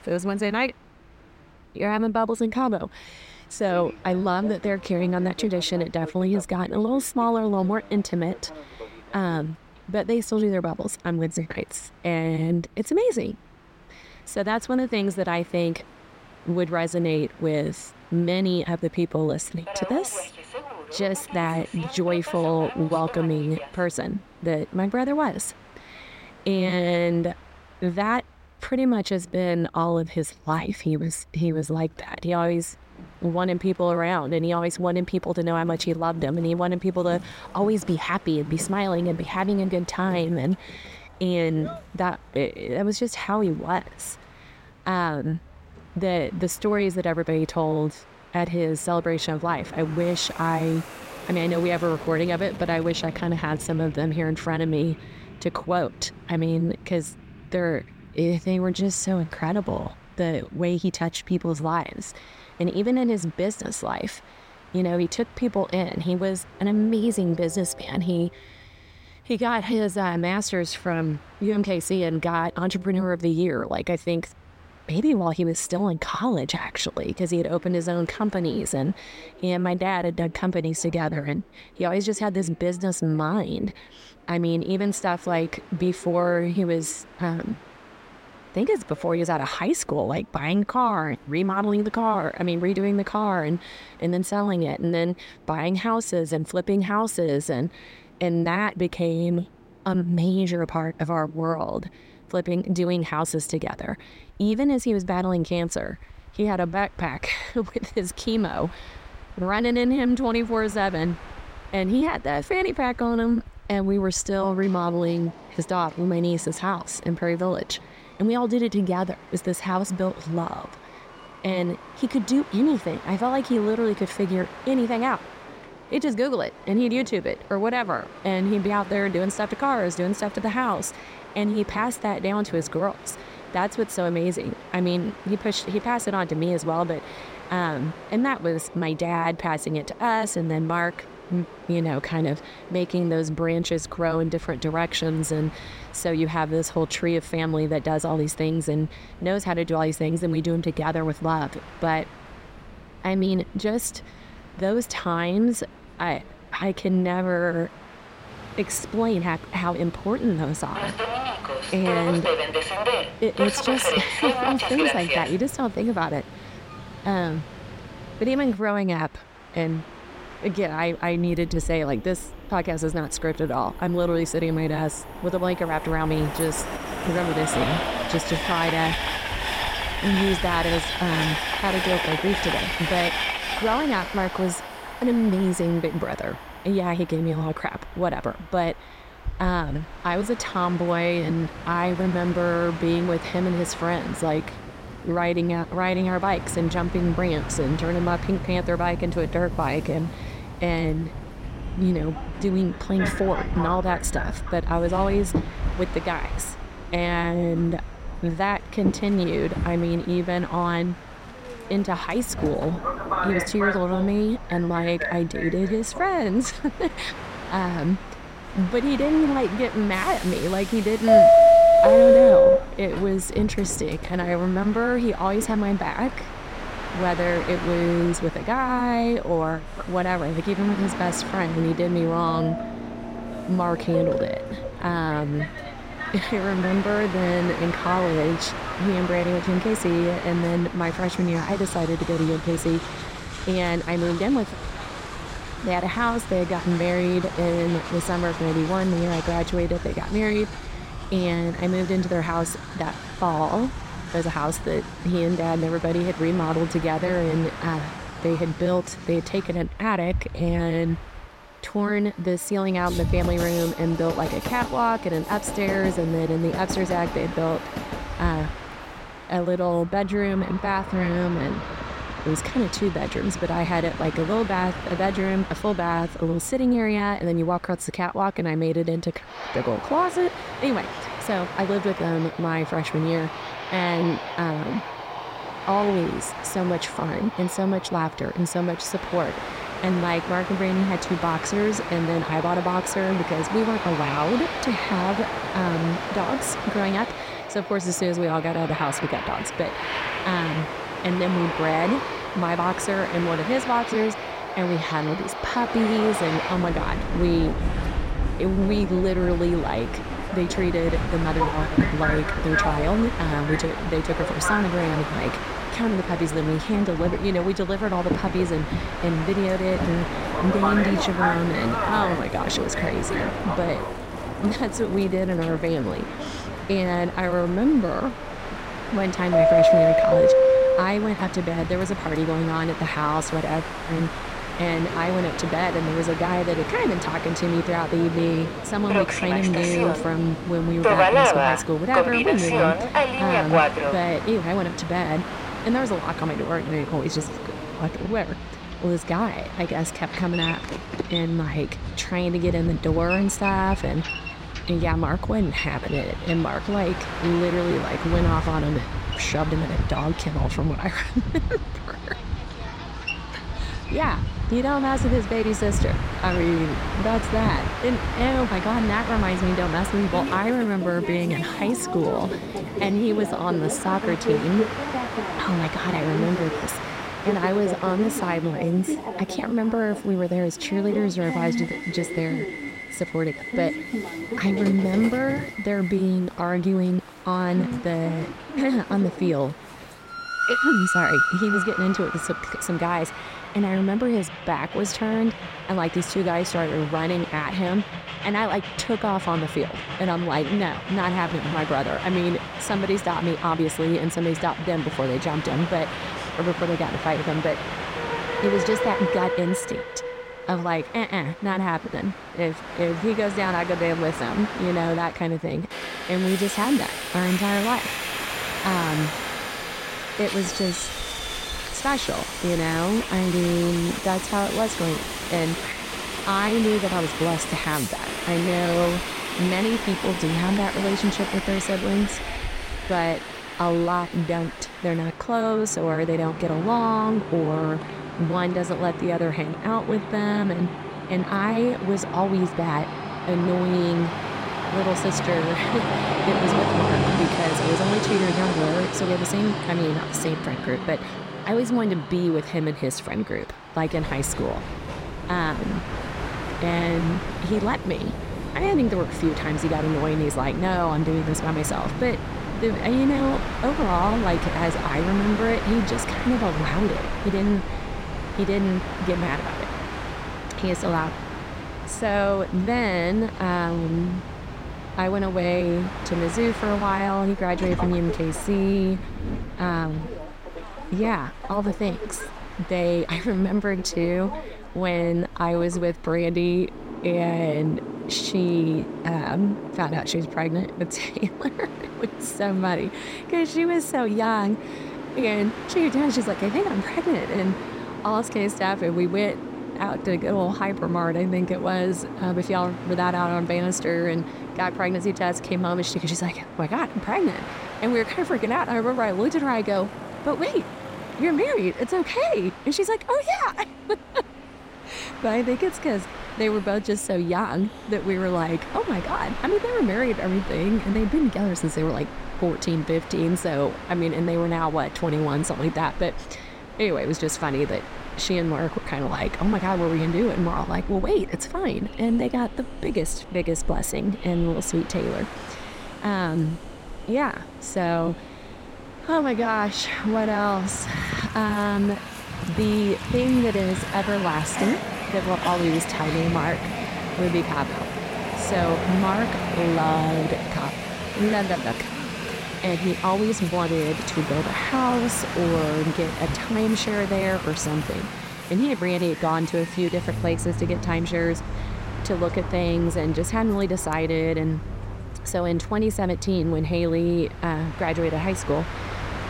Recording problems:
train or aircraft noise; loud; throughout; 4 dB below the speech

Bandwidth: 16 kHz